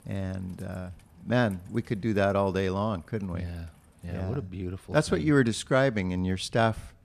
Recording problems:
rain or running water; faint; throughout; 30 dB below the speech

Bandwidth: 14.5 kHz